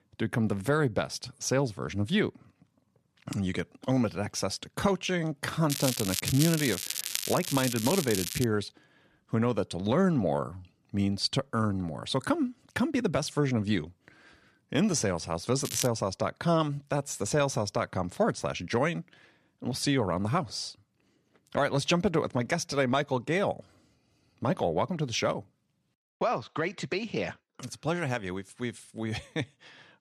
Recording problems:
crackling; loud; from 5.5 to 8.5 s and at 16 s; 3 dB below the speech

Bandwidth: 13.5 kHz